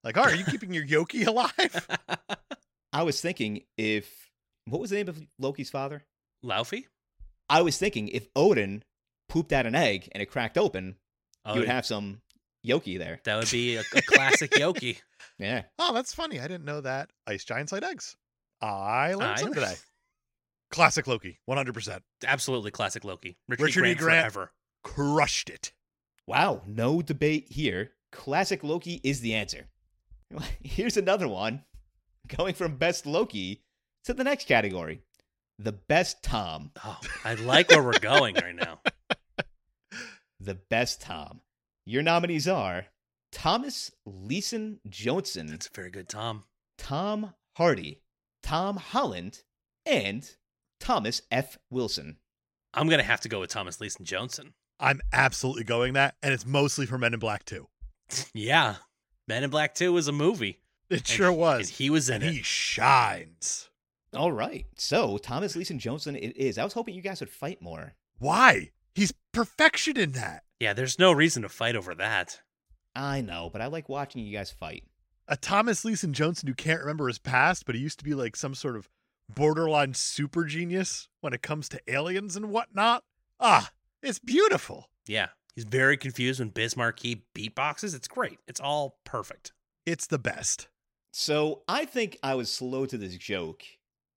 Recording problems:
none

